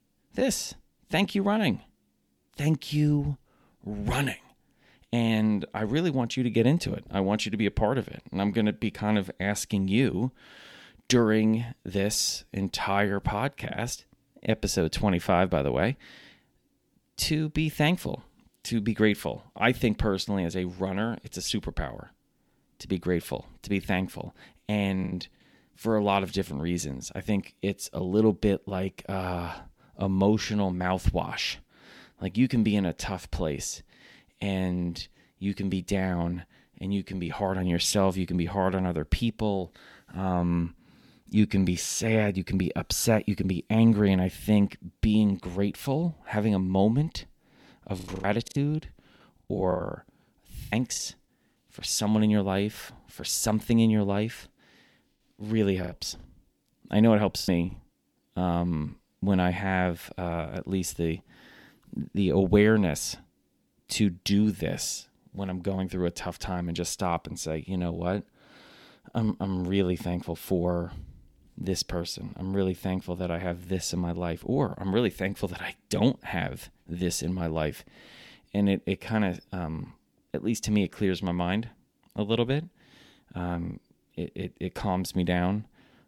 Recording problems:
choppy; very; at 25 s, from 48 to 51 s and from 56 to 58 s; 15% of the speech affected

